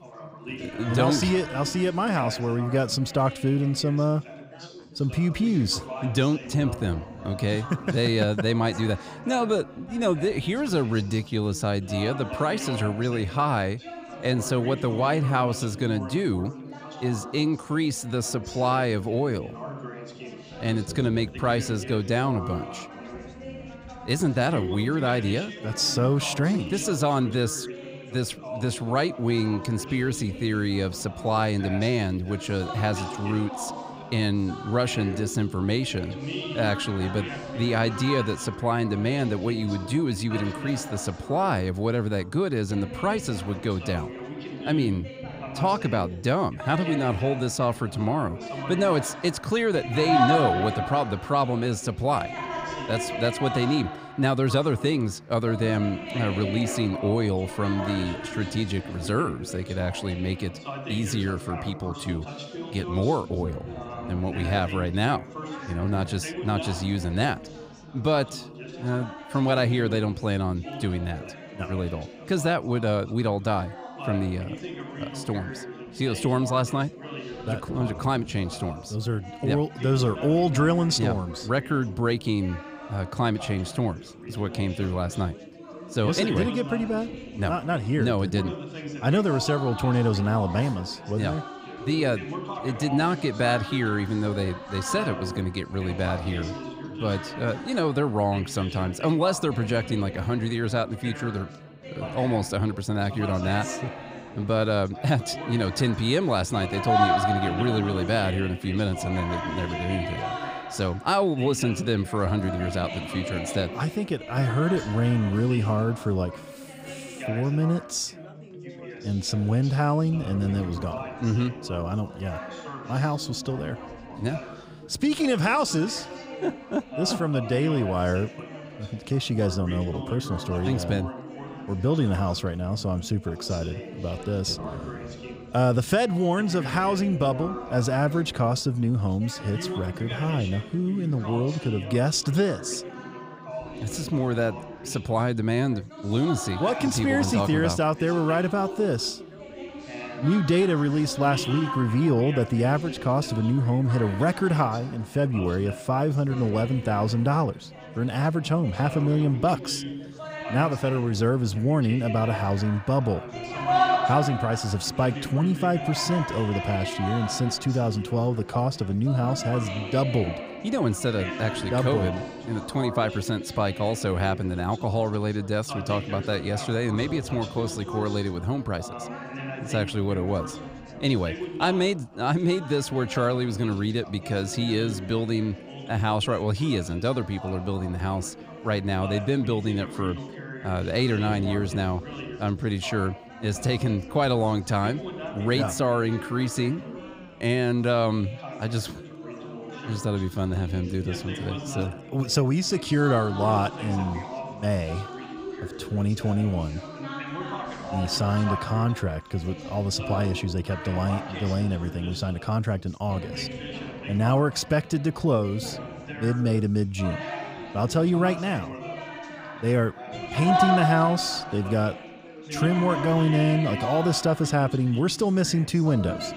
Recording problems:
background chatter; loud; throughout; 4 voices, 9 dB below the speech

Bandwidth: 15.5 kHz